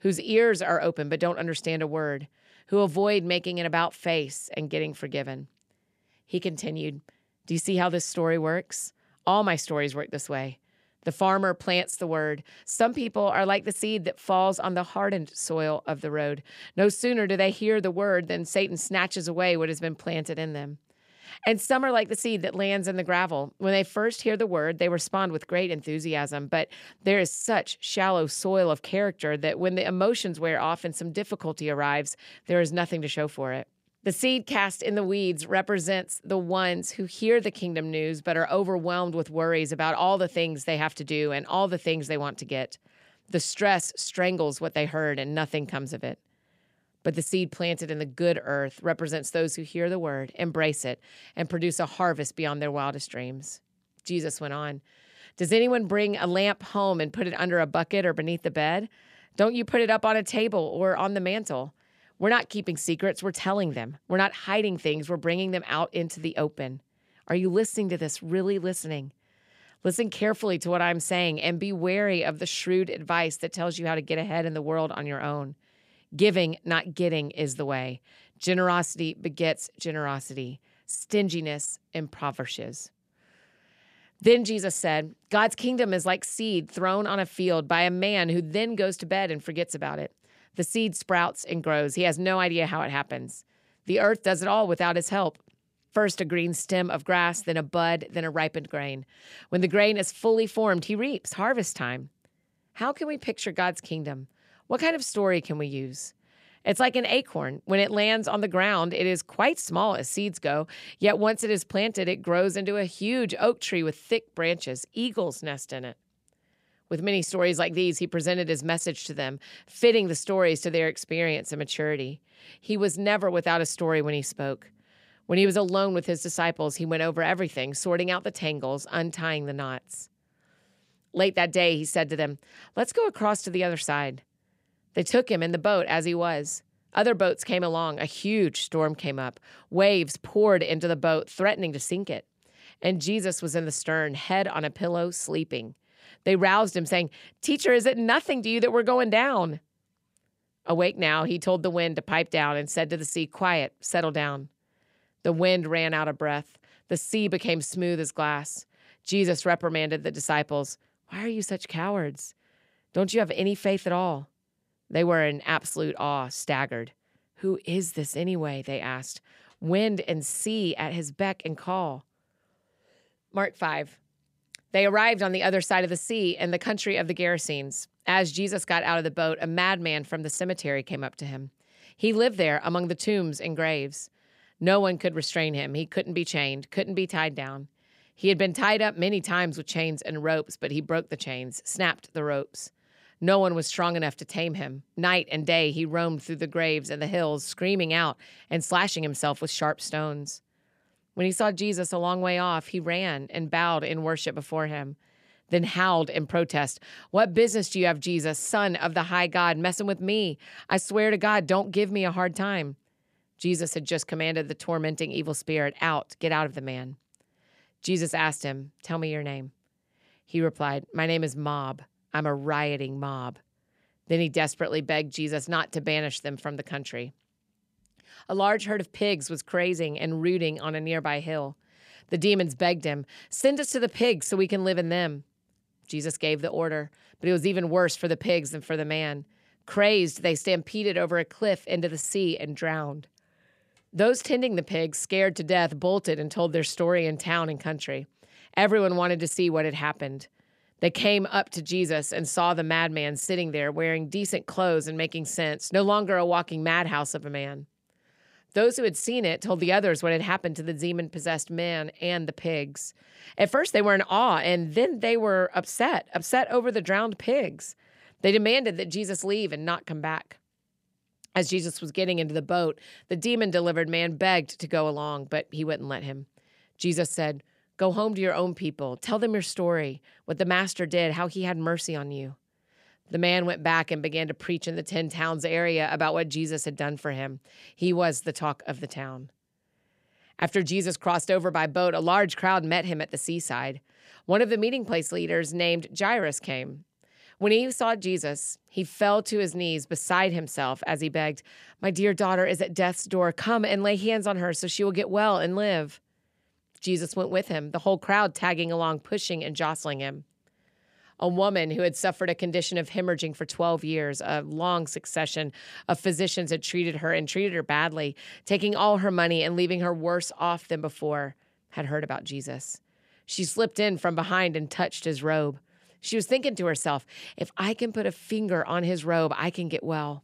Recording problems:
none

